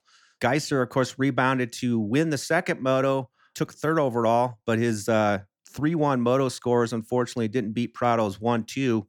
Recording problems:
none

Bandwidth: 18 kHz